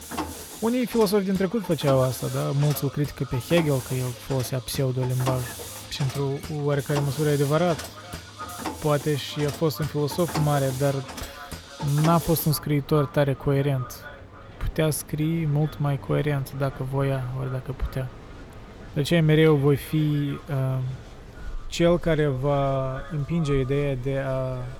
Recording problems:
echo of what is said; faint; throughout; 420 ms later, 20 dB below the speech
machinery noise; noticeable; throughout; 15 dB below the speech

